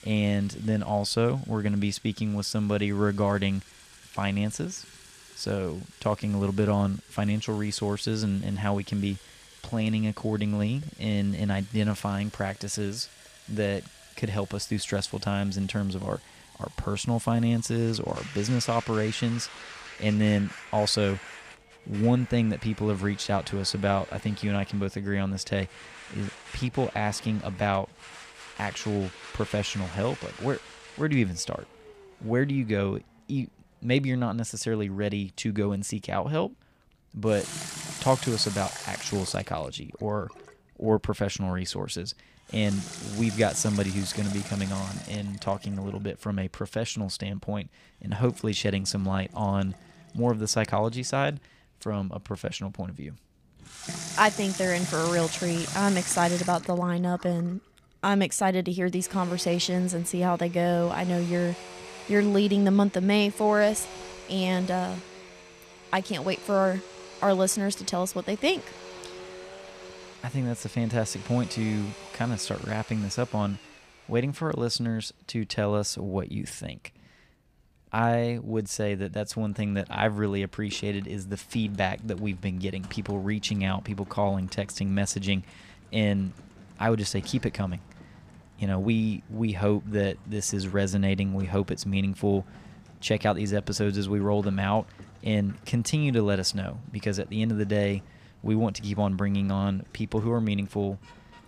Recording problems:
household noises; noticeable; throughout; 15 dB below the speech

